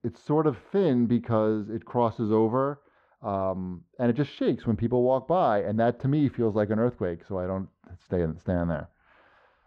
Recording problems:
muffled; very; fading above 1.5 kHz

